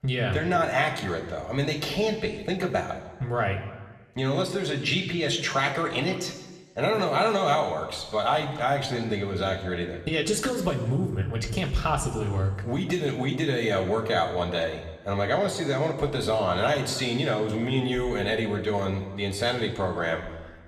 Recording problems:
room echo; slight; dies away in 1.2 s
off-mic speech; somewhat distant

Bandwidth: 14.5 kHz